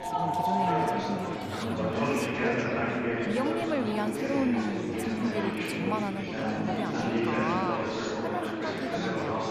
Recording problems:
chatter from many people; very loud; throughout; 4 dB above the speech

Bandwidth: 14.5 kHz